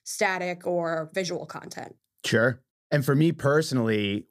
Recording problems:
none

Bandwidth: 15 kHz